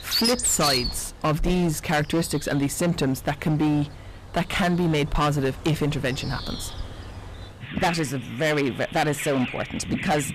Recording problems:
distortion; heavy; 13% of the sound clipped
animal sounds; loud; throughout; 4 dB below the speech

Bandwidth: 14.5 kHz